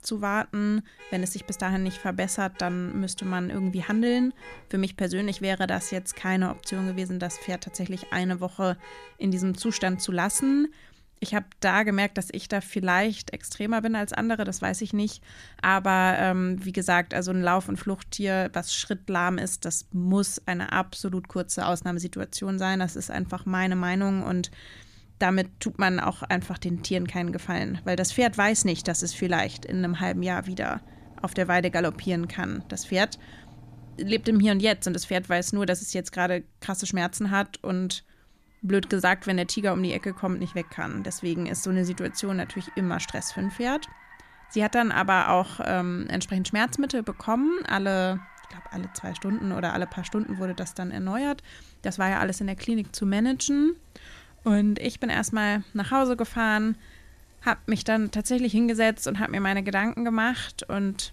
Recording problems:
traffic noise; faint; throughout; 25 dB below the speech

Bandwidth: 14.5 kHz